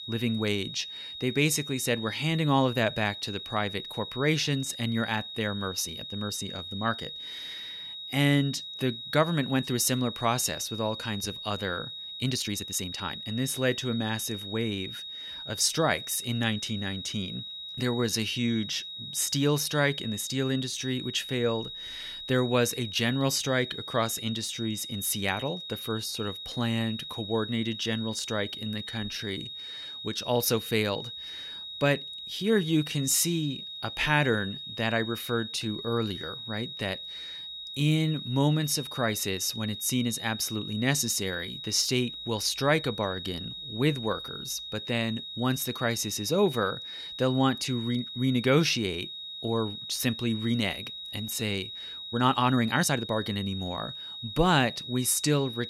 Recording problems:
high-pitched whine; loud; throughout; 4 kHz, 8 dB below the speech
uneven, jittery; strongly; from 5 to 53 s

